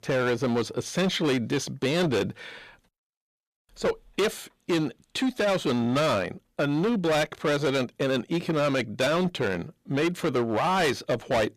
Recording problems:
distortion; heavy; 16% of the sound clipped

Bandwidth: 14.5 kHz